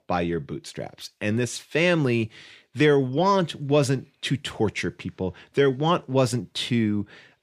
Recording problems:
none

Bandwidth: 15 kHz